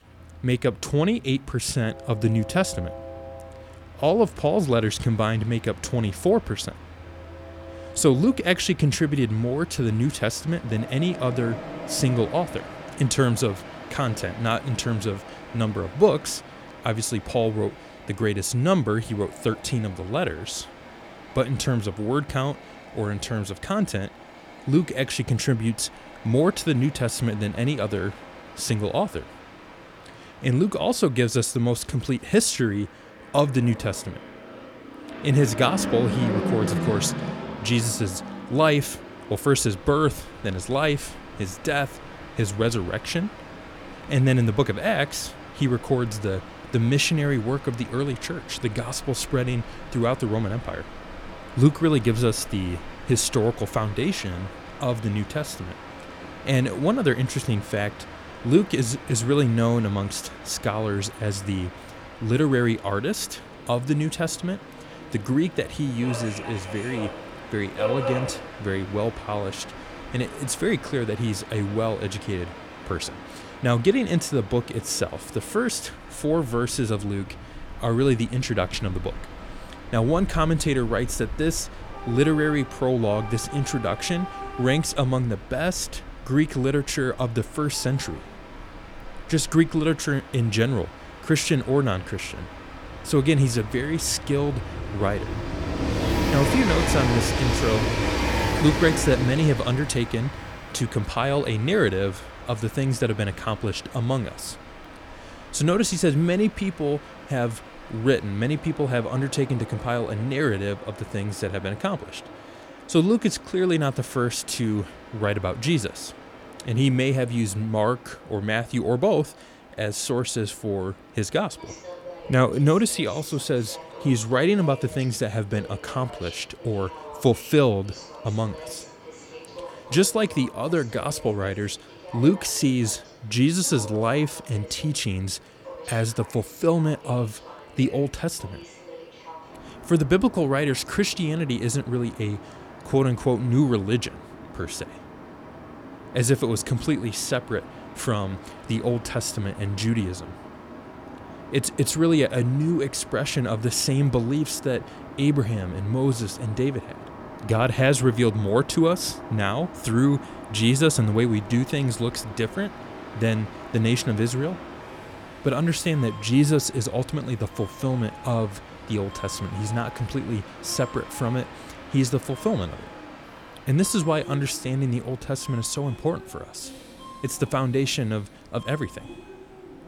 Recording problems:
train or aircraft noise; noticeable; throughout; 10 dB below the speech

